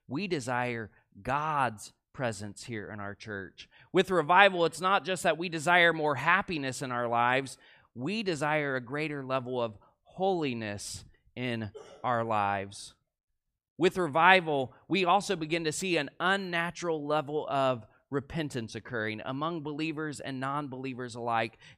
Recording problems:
none

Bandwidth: 15 kHz